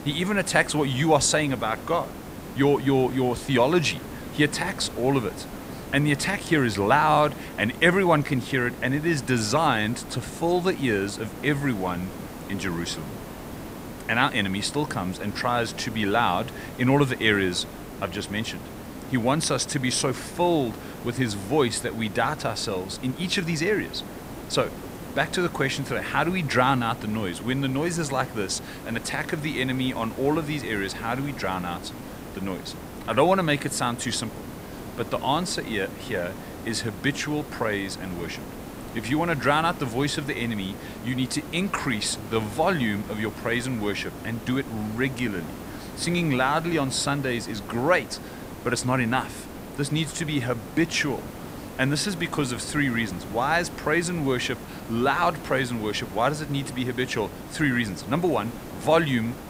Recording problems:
hiss; noticeable; throughout; 15 dB below the speech

